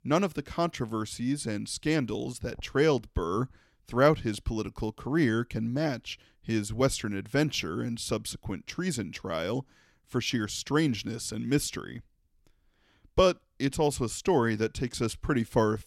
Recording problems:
none

